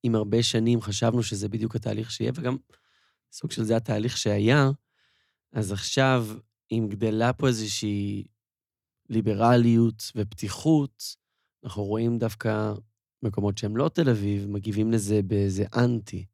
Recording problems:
none

